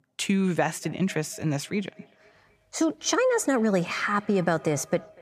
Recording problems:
echo of what is said; faint; throughout; 240 ms later, 25 dB below the speech

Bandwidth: 15 kHz